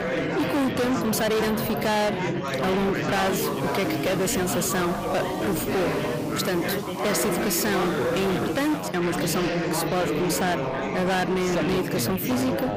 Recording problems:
distortion; heavy; 28% of the sound clipped
chatter from many people; loud; throughout; 1 dB below the speech
hiss; noticeable; from 3 to 9 s; 20 dB below the speech

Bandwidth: 15 kHz